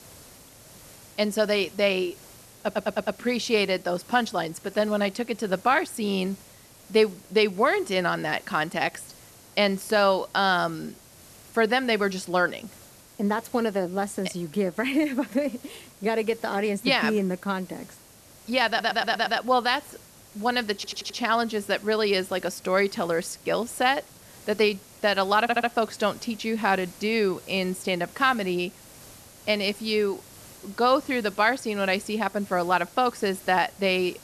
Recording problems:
hiss; faint; throughout; 20 dB below the speech
audio stuttering; 4 times, first at 2.5 s

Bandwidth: 13.5 kHz